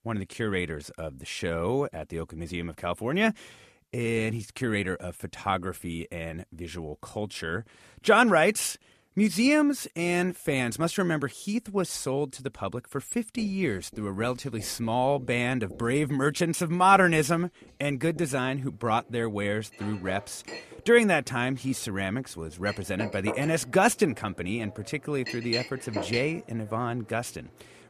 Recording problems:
household noises; noticeable; from 13 s on; 15 dB below the speech

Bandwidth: 14 kHz